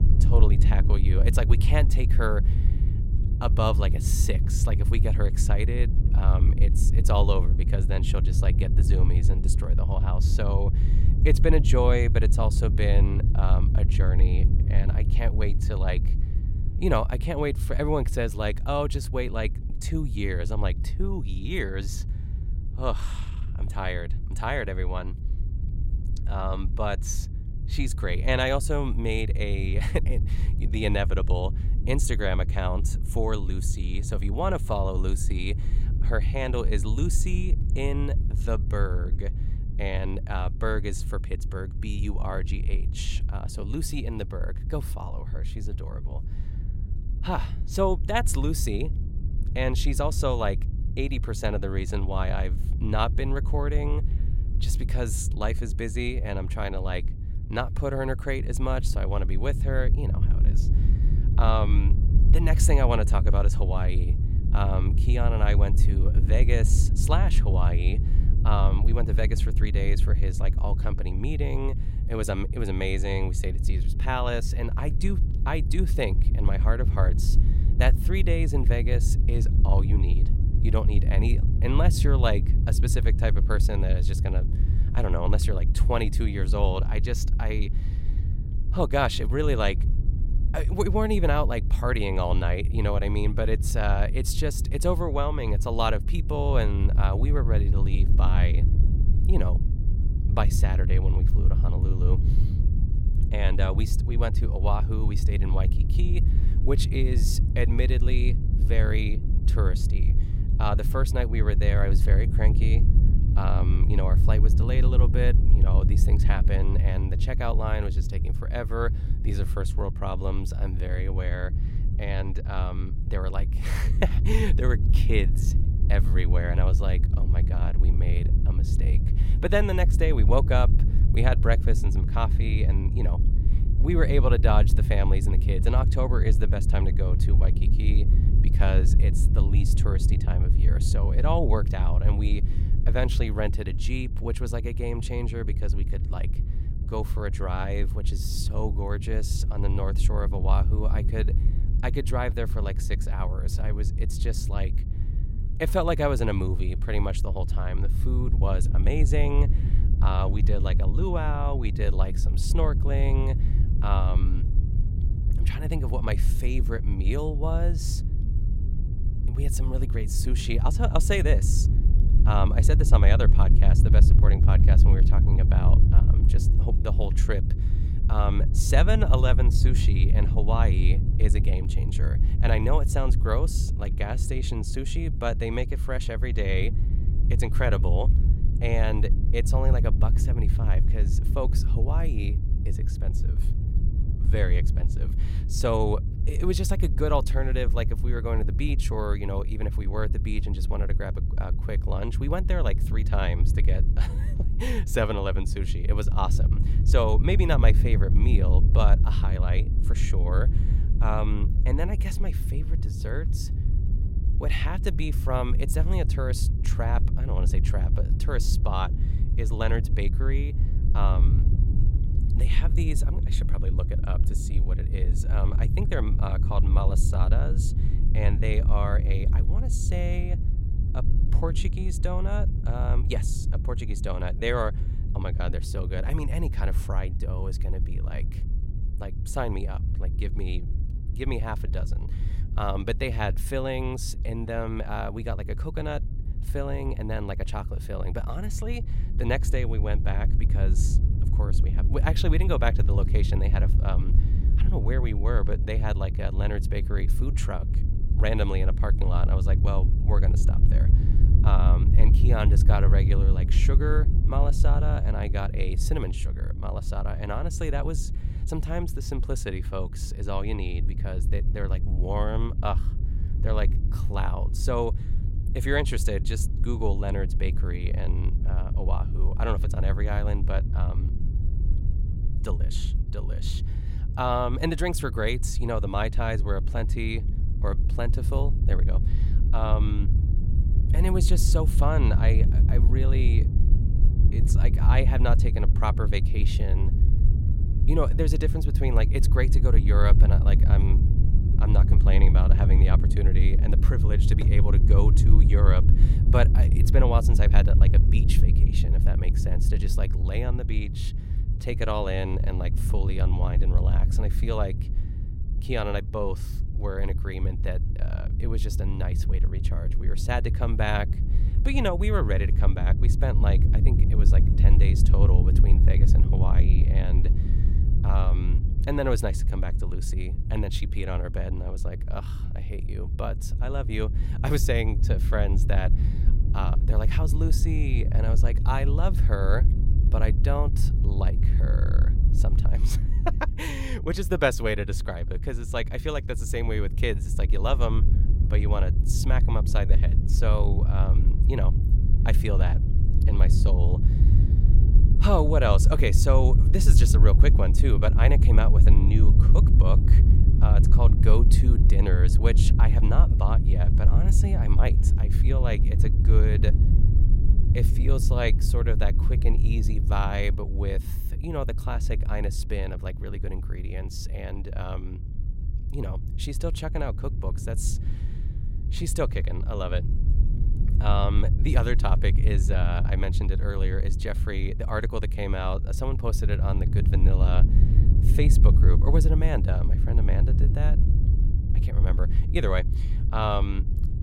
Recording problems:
low rumble; loud; throughout; 9 dB below the speech

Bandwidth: 16 kHz